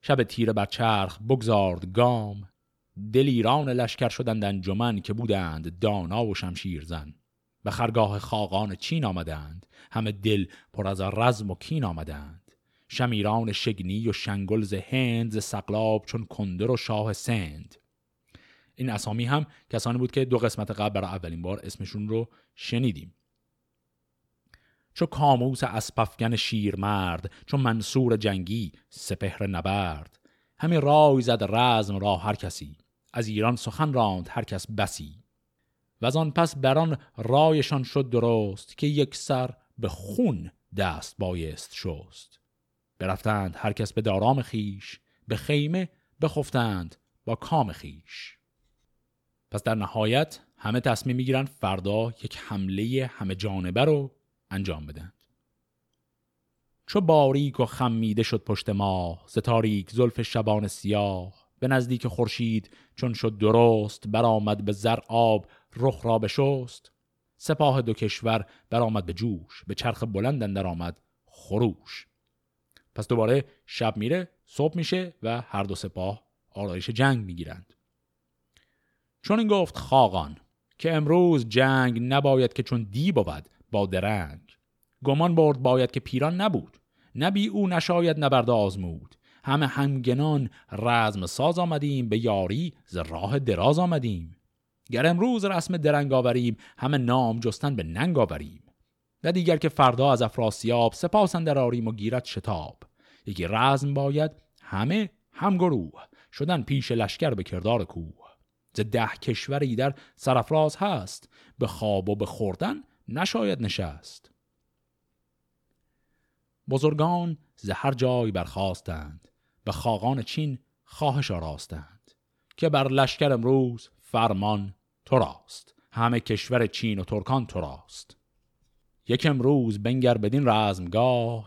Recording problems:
none

